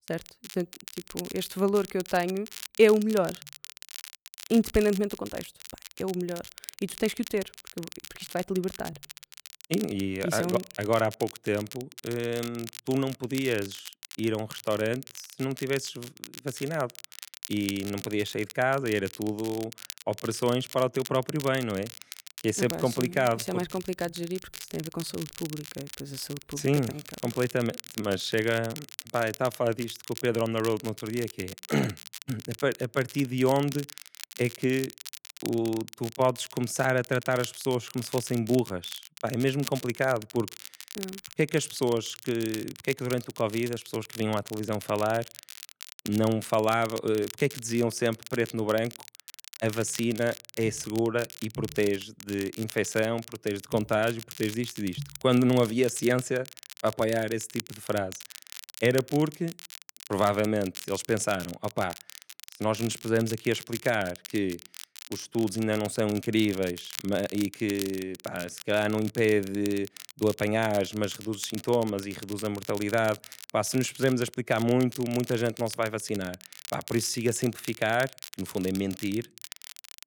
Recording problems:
crackle, like an old record; noticeable; 15 dB below the speech

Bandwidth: 18.5 kHz